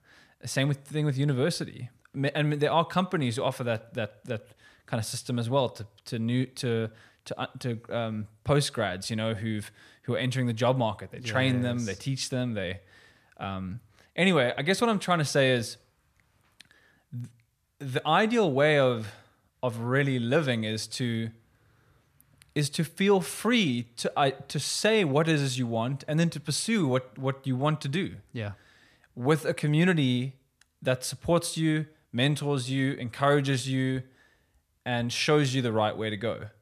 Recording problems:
none

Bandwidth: 14.5 kHz